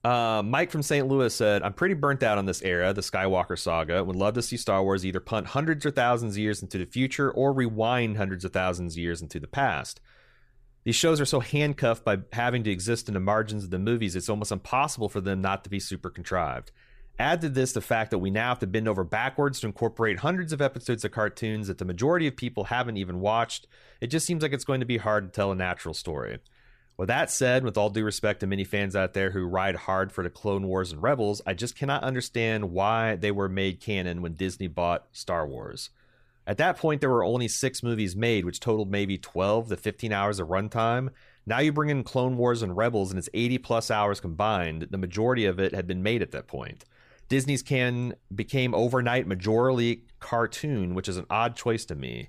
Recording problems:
none

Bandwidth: 14.5 kHz